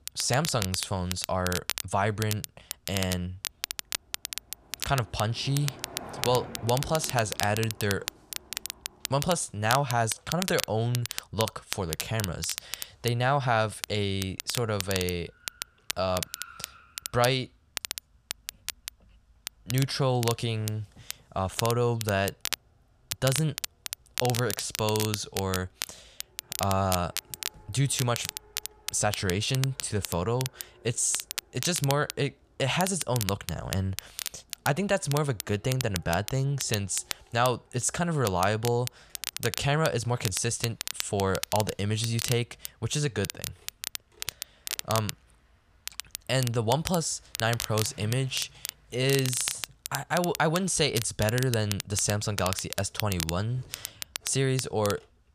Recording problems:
crackle, like an old record; loud; 7 dB below the speech
traffic noise; faint; throughout; 25 dB below the speech

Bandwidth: 14.5 kHz